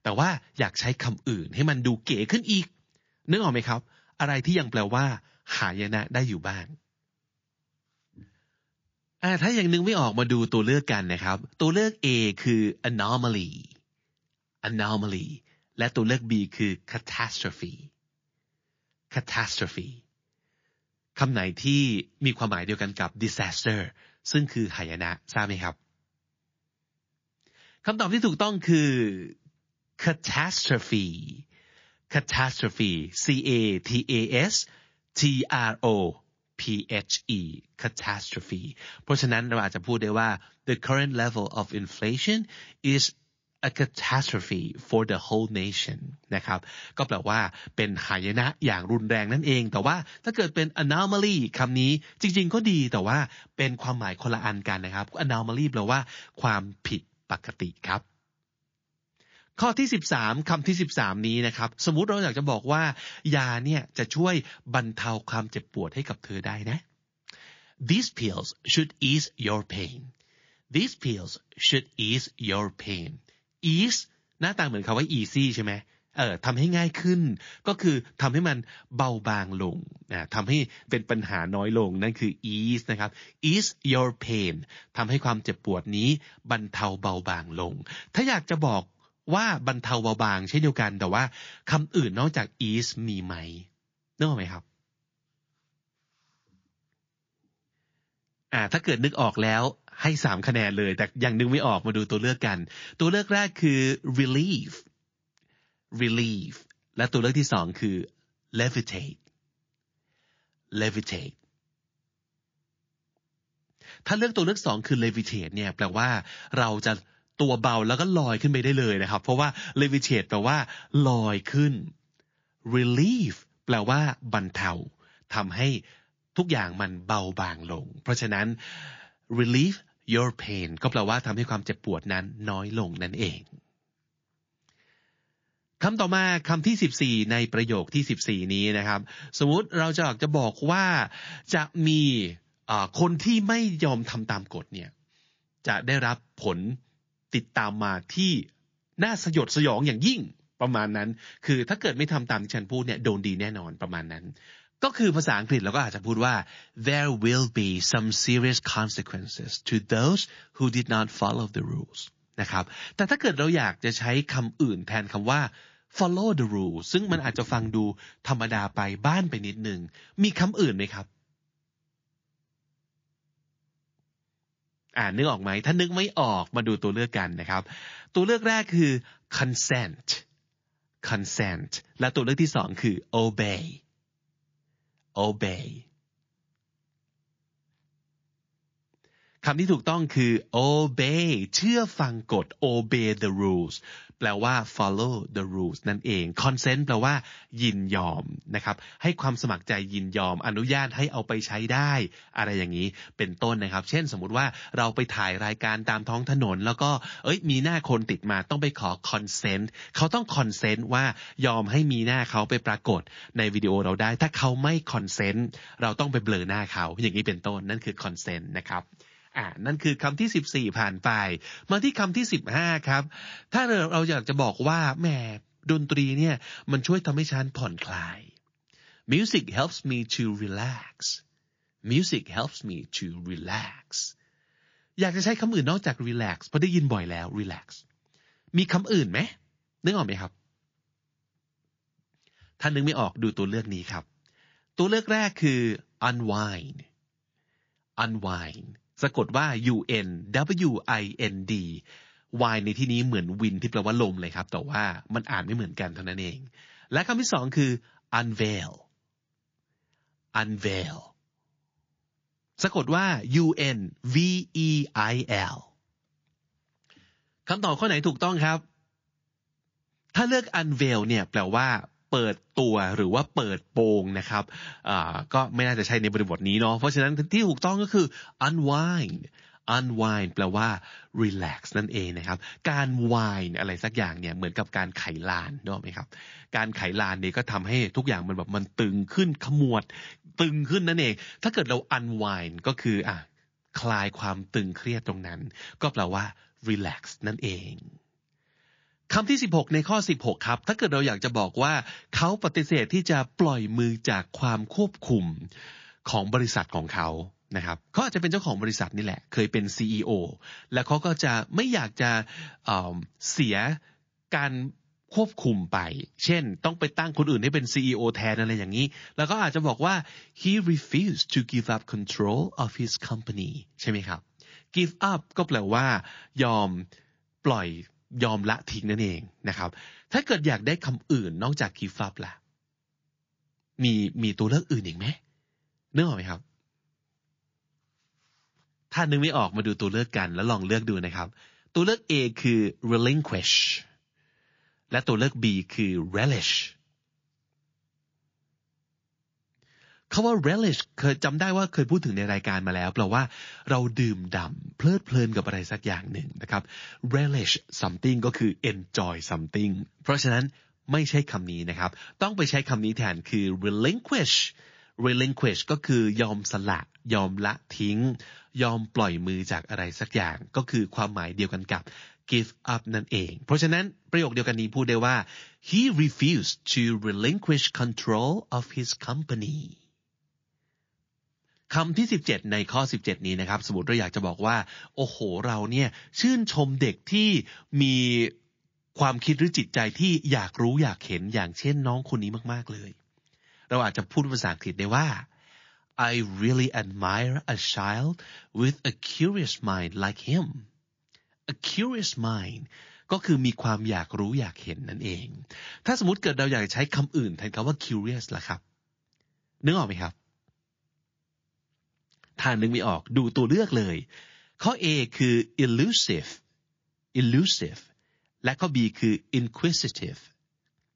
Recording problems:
garbled, watery; slightly; nothing above 6.5 kHz

